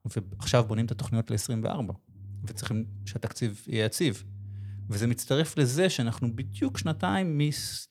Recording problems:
low rumble; faint; throughout; 25 dB below the speech

